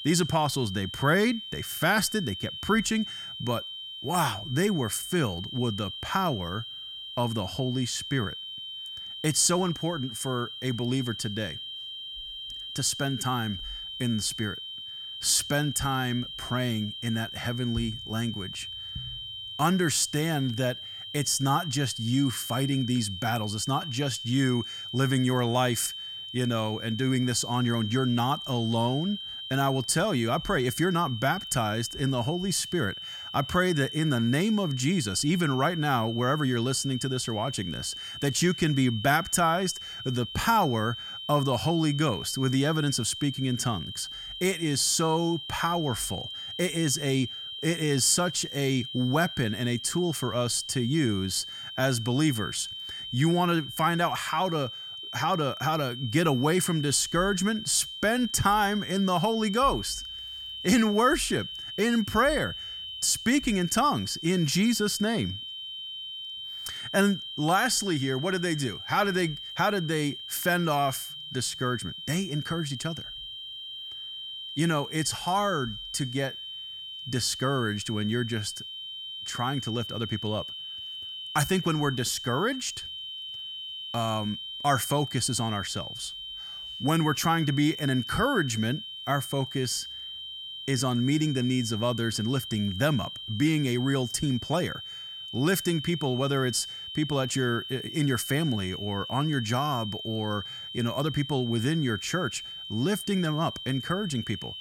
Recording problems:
high-pitched whine; loud; throughout; 3 kHz, 9 dB below the speech

